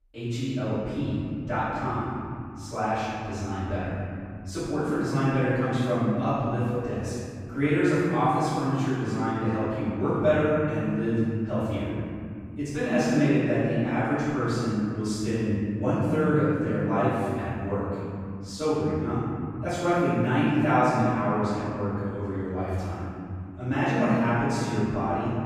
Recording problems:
room echo; strong; dies away in 2.6 s
off-mic speech; far

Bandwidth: 15 kHz